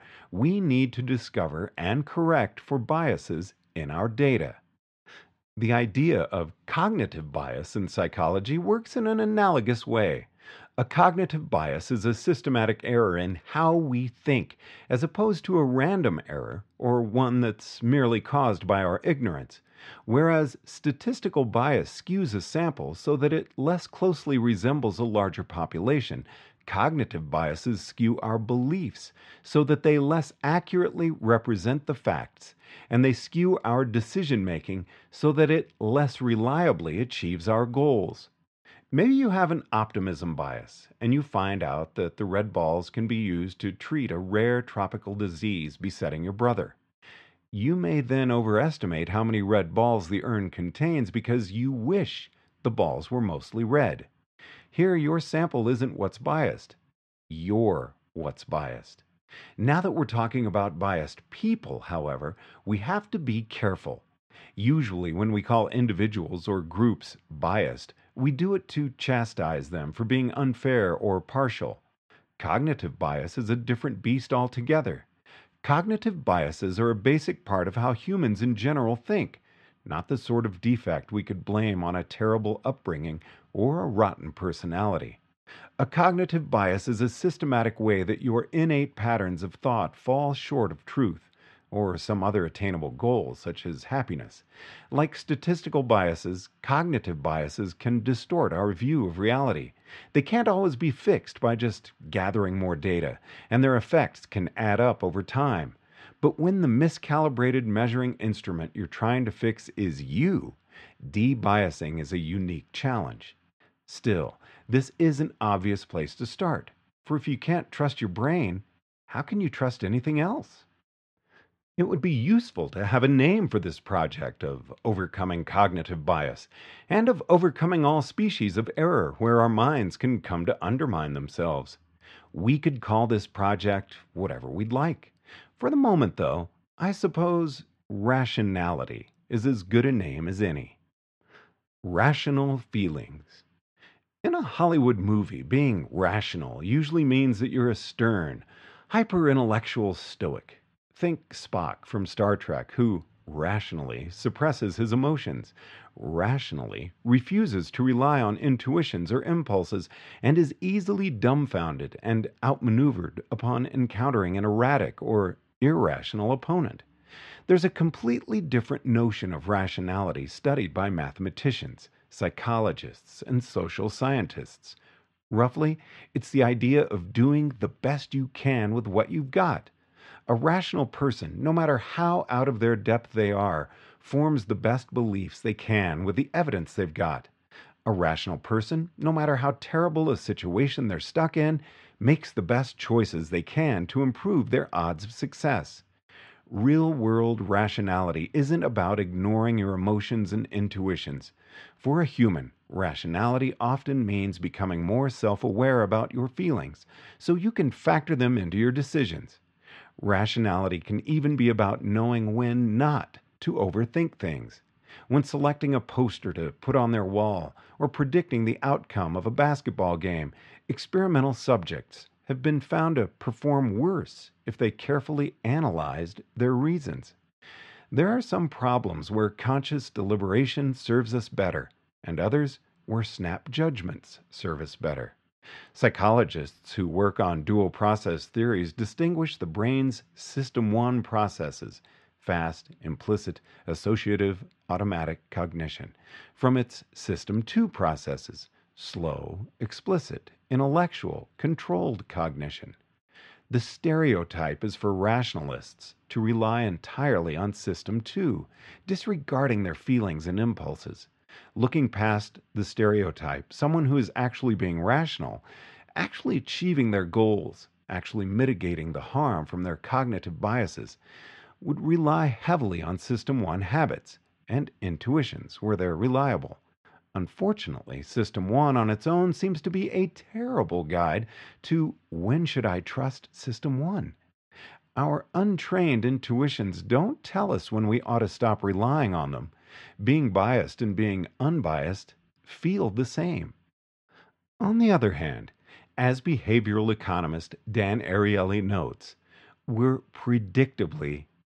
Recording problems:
muffled; slightly; fading above 3.5 kHz

